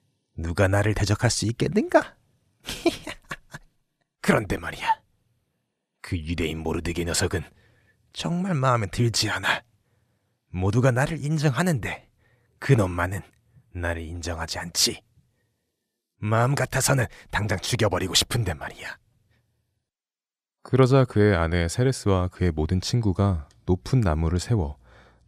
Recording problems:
none

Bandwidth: 14.5 kHz